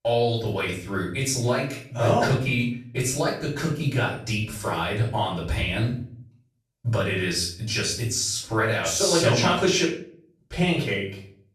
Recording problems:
off-mic speech; far
room echo; noticeable; dies away in 0.4 s

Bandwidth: 13.5 kHz